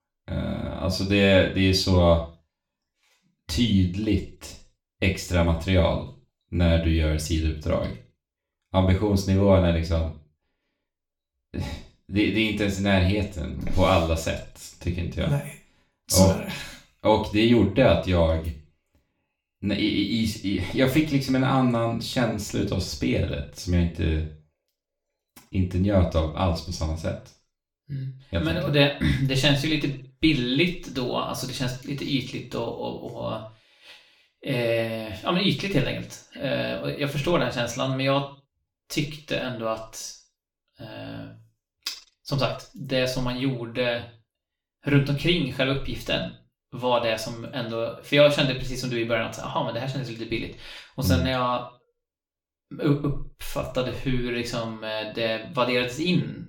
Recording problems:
off-mic speech; far
room echo; slight; dies away in 0.4 s

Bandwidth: 17.5 kHz